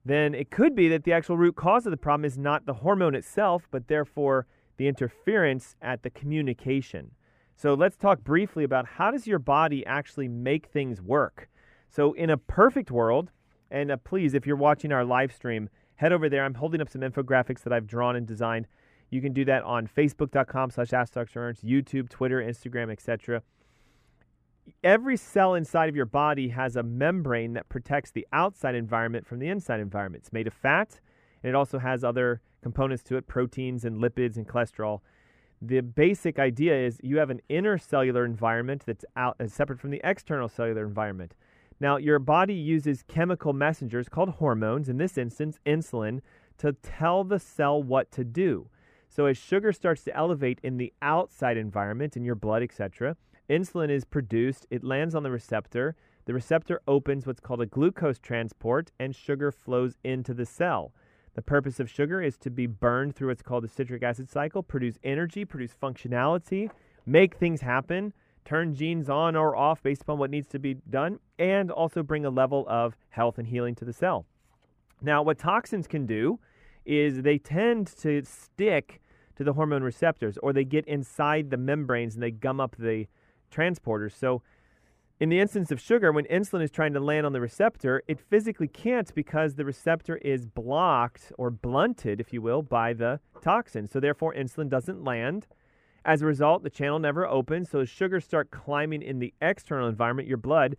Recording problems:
muffled; slightly; fading above 2.5 kHz

